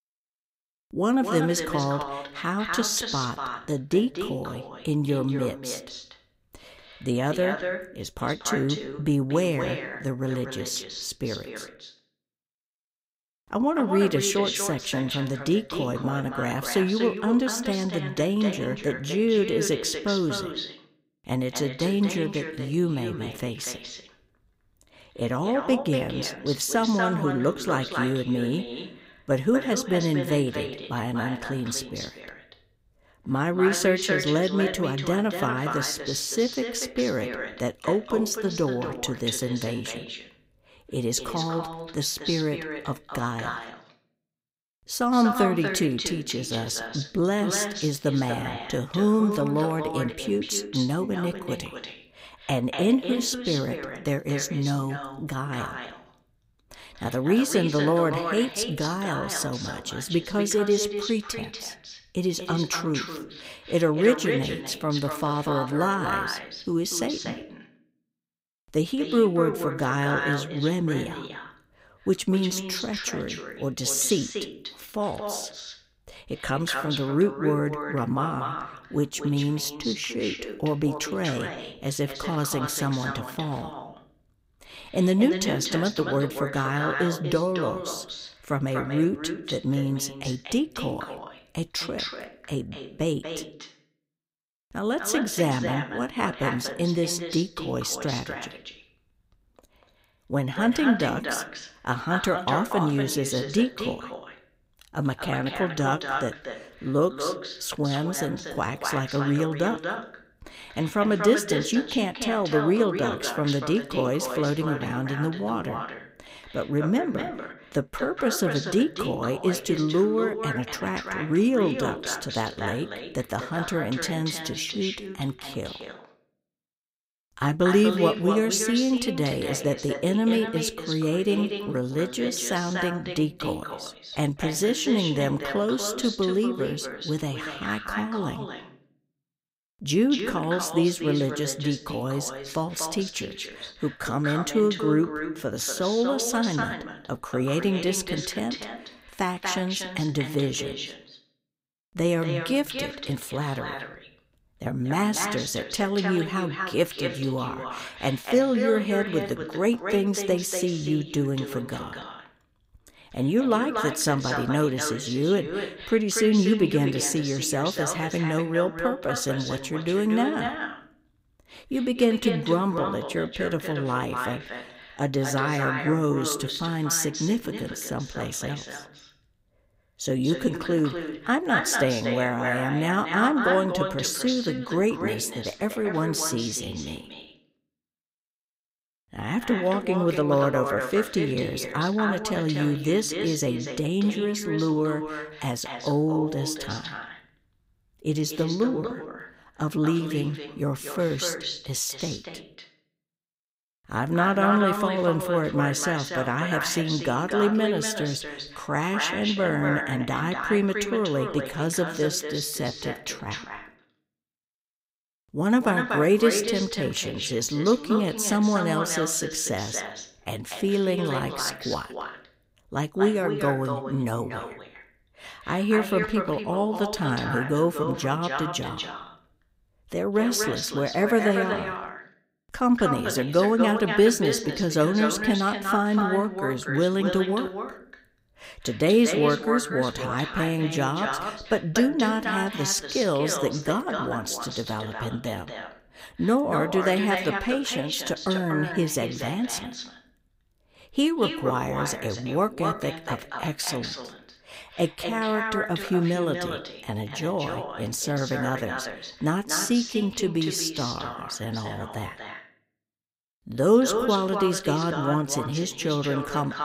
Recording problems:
echo of what is said; strong; throughout; 240 ms later, 6 dB below the speech

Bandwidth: 15.5 kHz